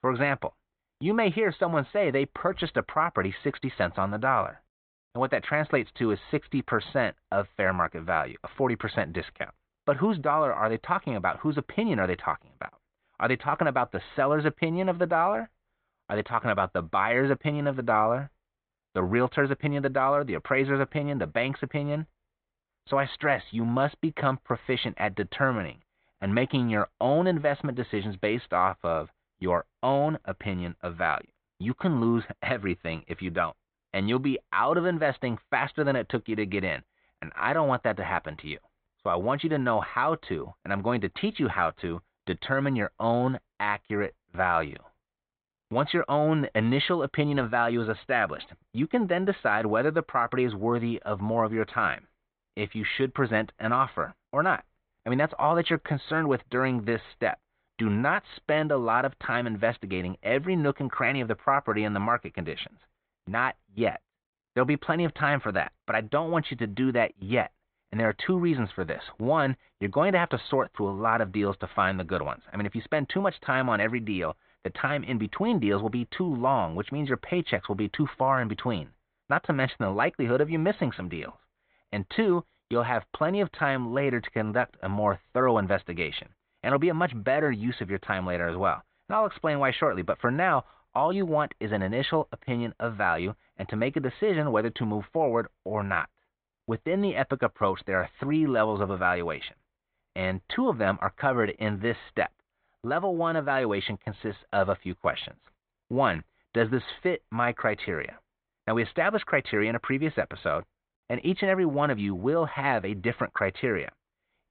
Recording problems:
high frequencies cut off; severe; nothing above 4 kHz

